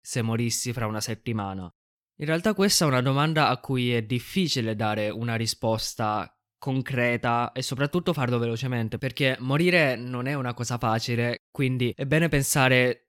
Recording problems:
none

